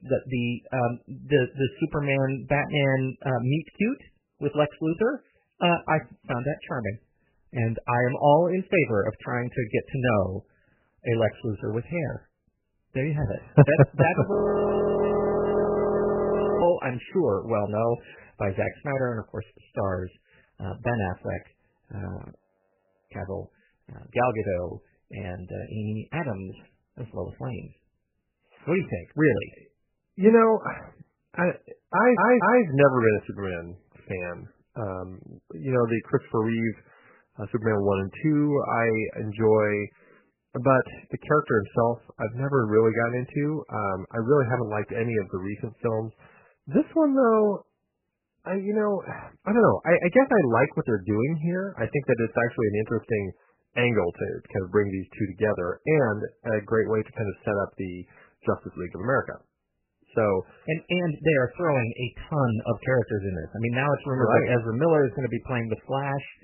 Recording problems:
garbled, watery; badly; nothing above 3 kHz
audio freezing; at 14 s for 2.5 s and at 22 s for 0.5 s
audio stuttering; at 32 s

